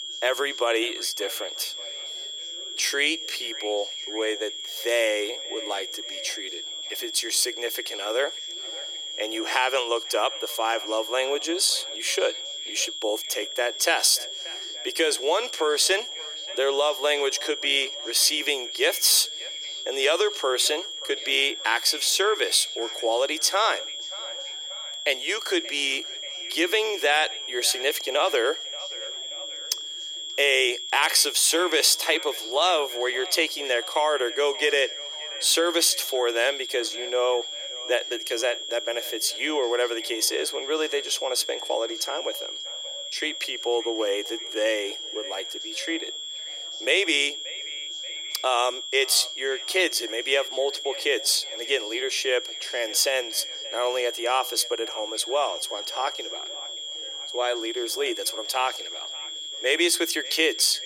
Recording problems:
thin; very; fading below 350 Hz
echo of what is said; faint; throughout; 580 ms later, 20 dB below the speech
high-pitched whine; loud; throughout; 3.5 kHz, 7 dB below the speech
background chatter; faint; throughout; 2 voices, 30 dB below the speech

